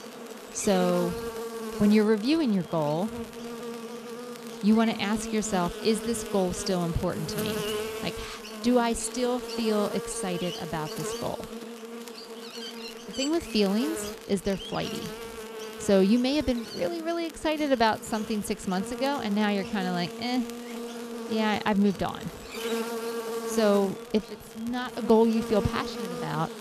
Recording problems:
electrical hum; loud; throughout; 50 Hz, 8 dB below the speech
crackle, like an old record; faint; 25 dB below the speech

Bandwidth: 14 kHz